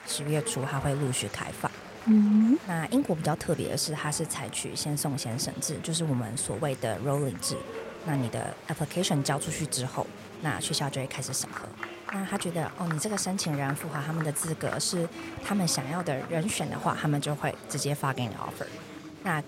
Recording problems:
chatter from many people; noticeable; throughout; 10 dB below the speech

